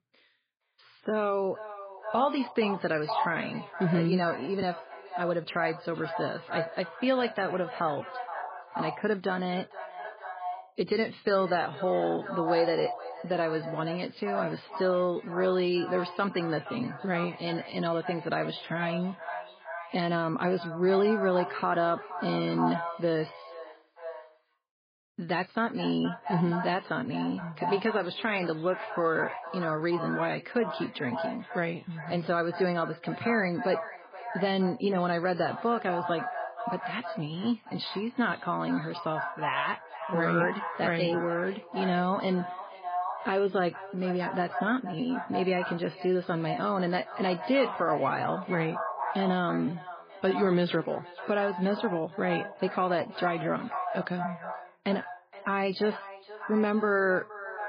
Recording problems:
echo of what is said; strong; throughout; 470 ms later, 9 dB below the speech
garbled, watery; badly; nothing above 5 kHz

